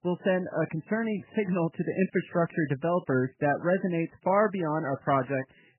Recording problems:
garbled, watery; badly; nothing above 3 kHz

